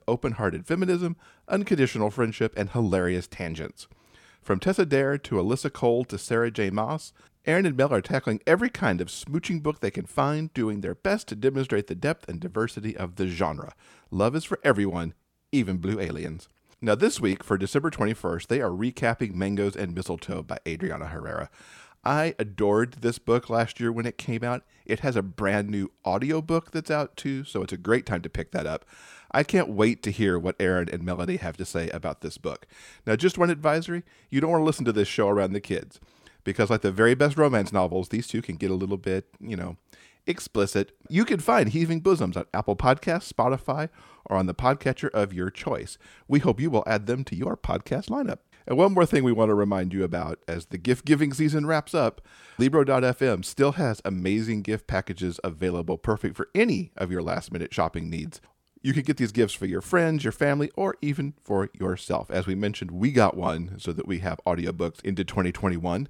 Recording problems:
none

